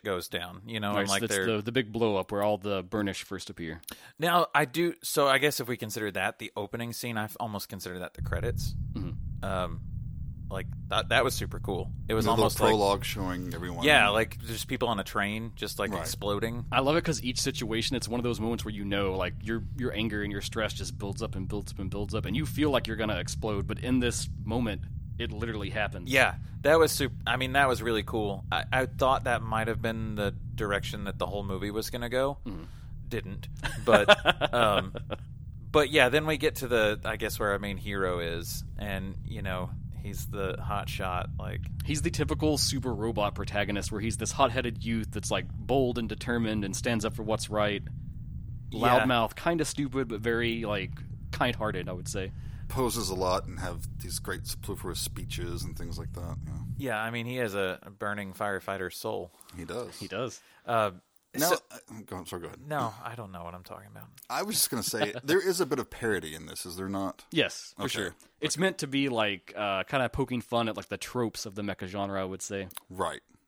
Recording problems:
low rumble; faint; from 8 to 57 s; 25 dB below the speech

